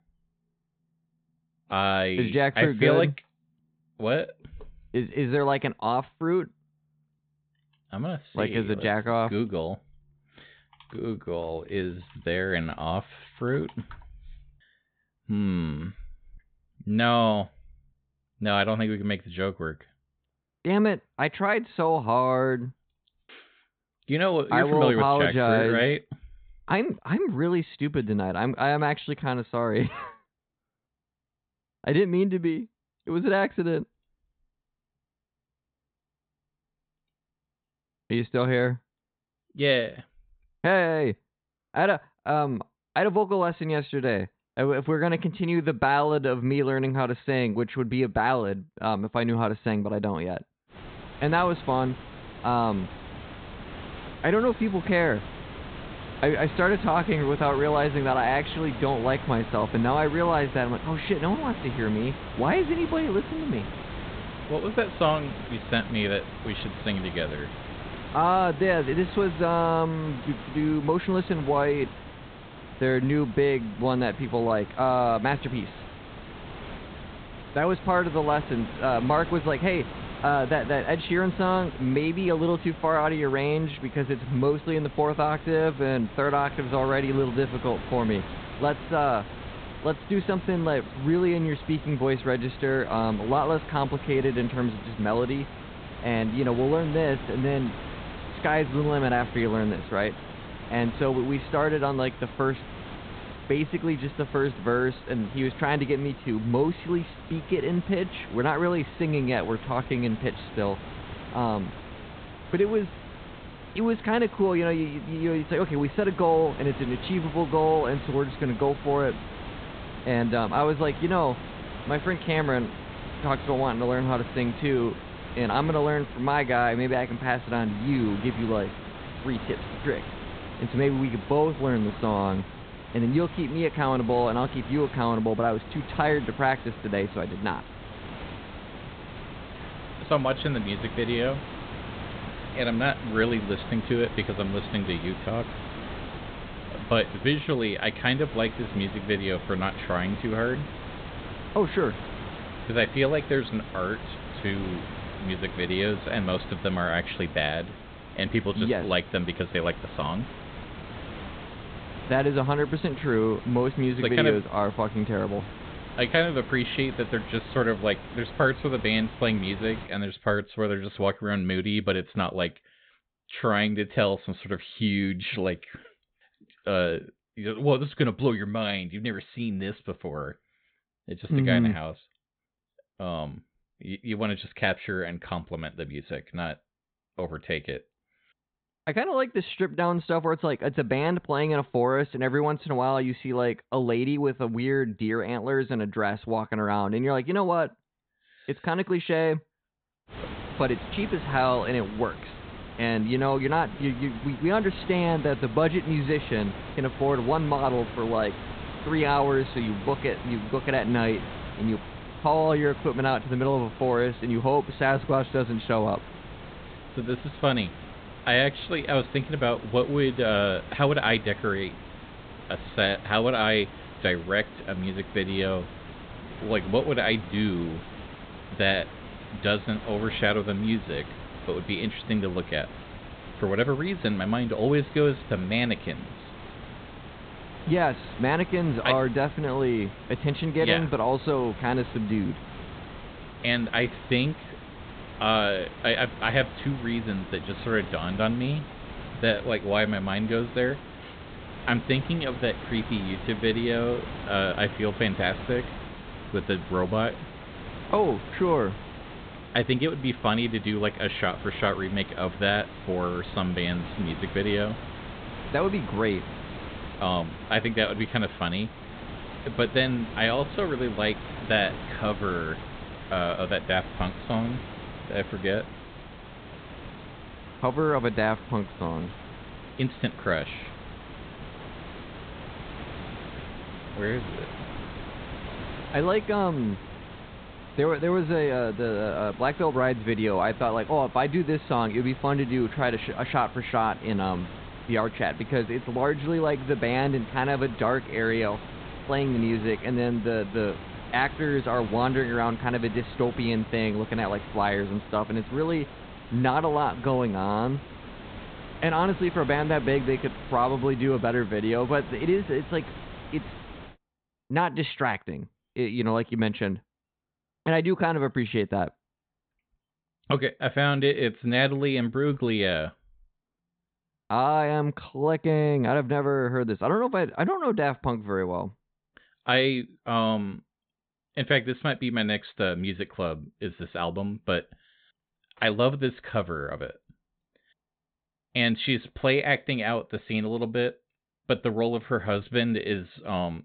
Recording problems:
high frequencies cut off; severe; nothing above 4 kHz
hiss; noticeable; from 51 s to 2:50 and from 3:20 to 5:14; 15 dB below the speech

